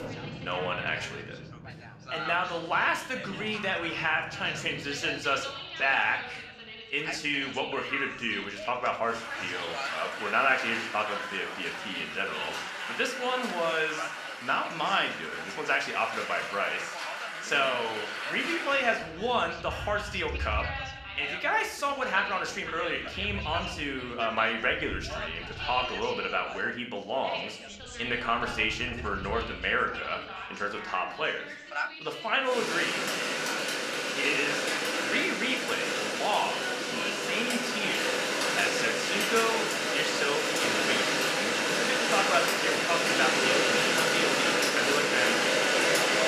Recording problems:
thin; somewhat; fading below 800 Hz
room echo; slight; dies away in 0.5 s
off-mic speech; somewhat distant
rain or running water; very loud; throughout; 1 dB above the speech
background chatter; loud; throughout; 3 voices, 9 dB below the speech

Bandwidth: 14.5 kHz